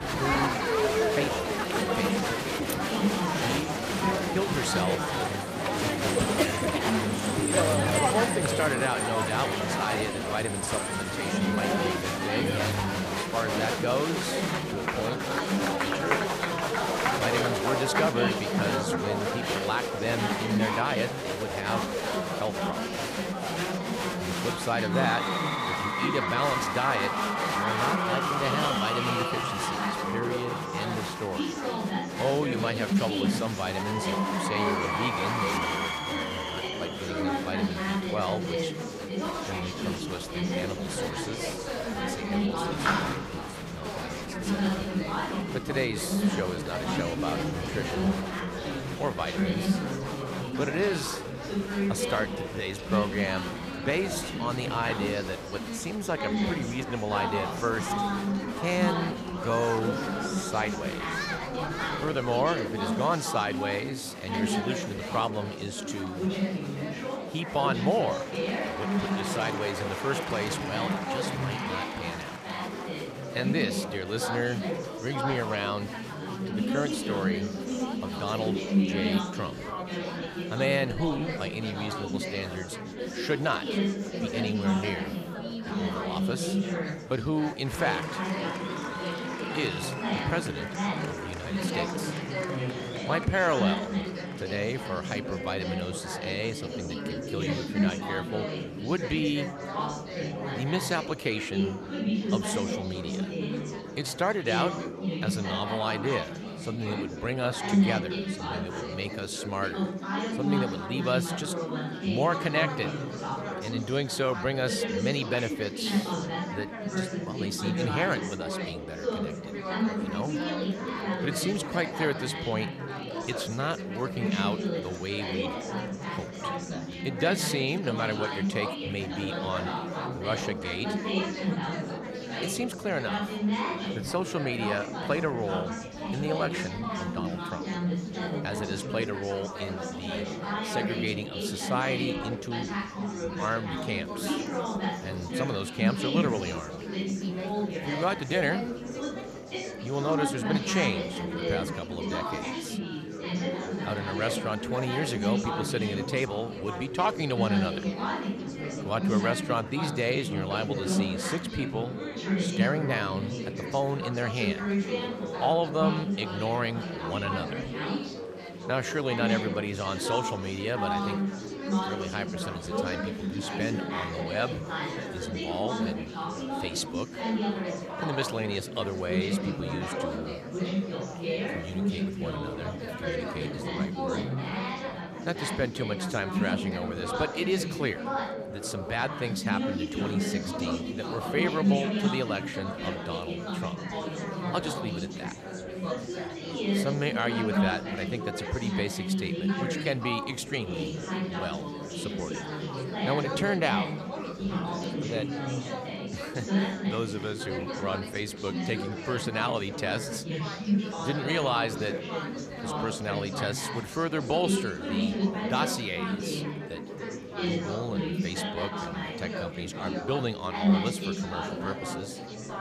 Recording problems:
murmuring crowd; very loud; throughout; 1 dB above the speech

